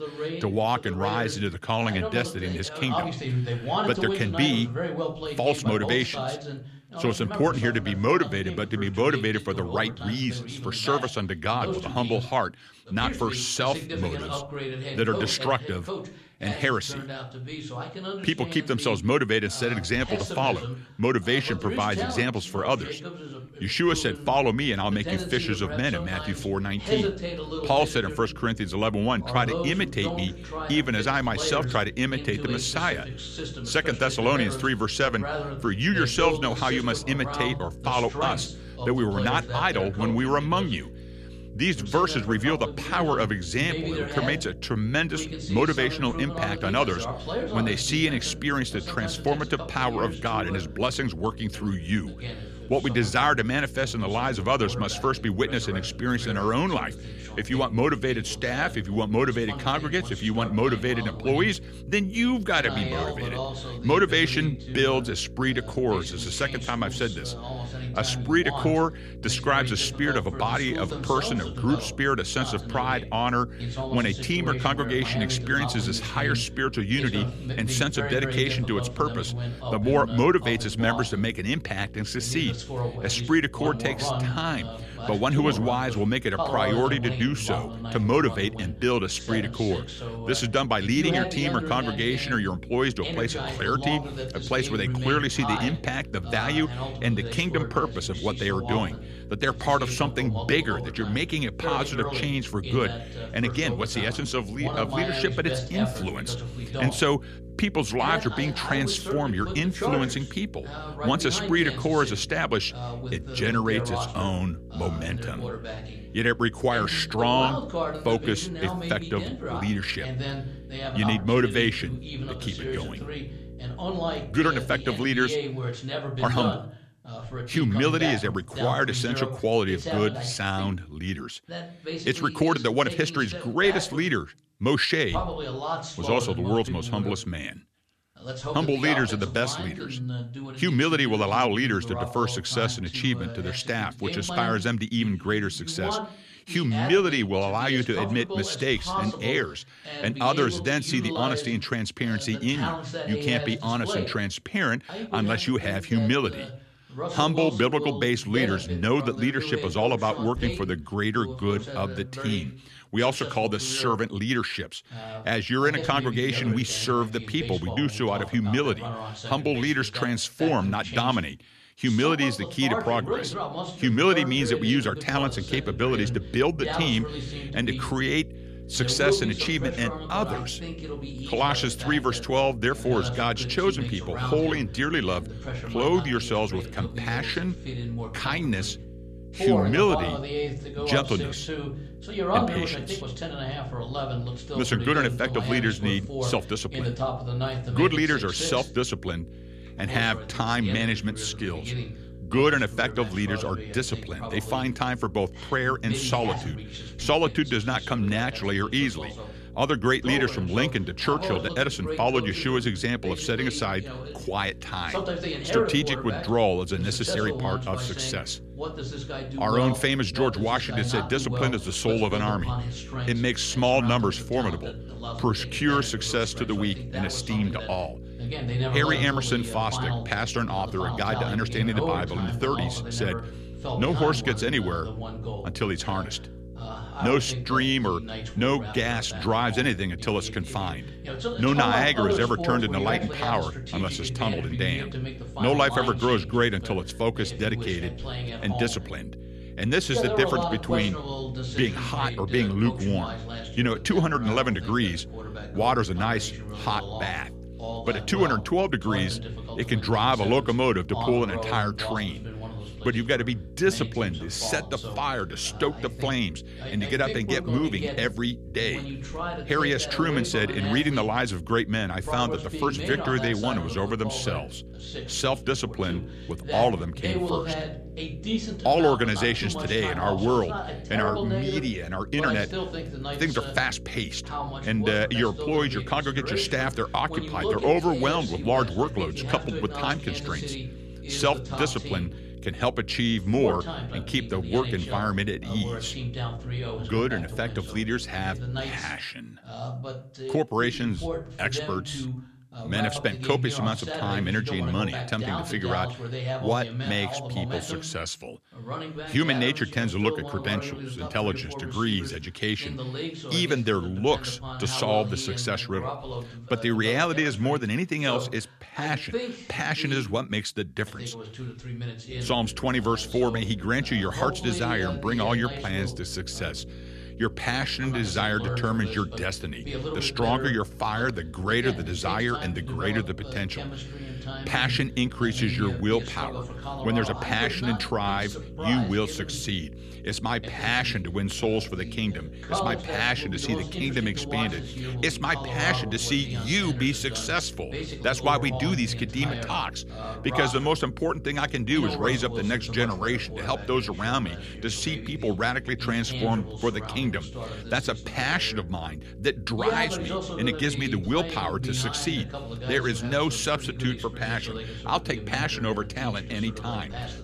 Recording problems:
voice in the background; loud; throughout; 7 dB below the speech
electrical hum; faint; from 24 s to 2:05, from 2:55 to 4:59 and from 5:22 on; 60 Hz, 20 dB below the speech

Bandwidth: 14 kHz